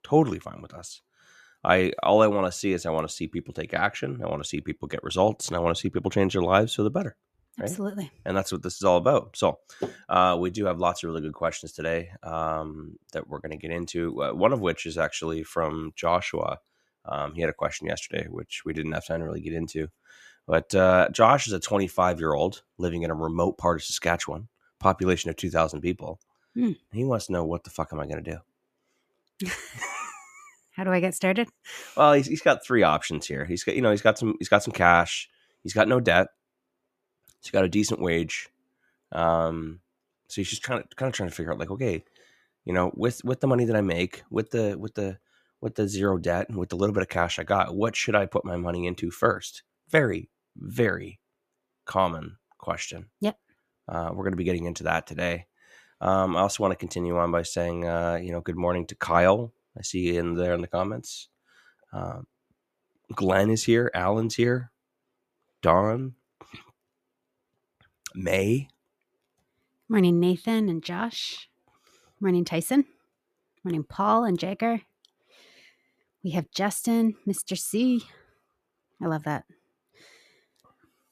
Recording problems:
none

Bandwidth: 14.5 kHz